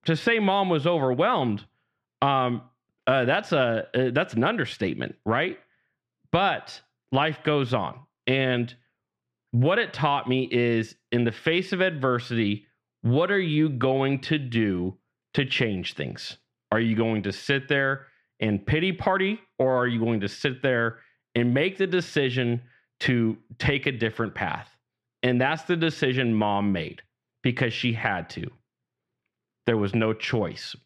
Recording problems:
muffled; slightly; fading above 3 kHz

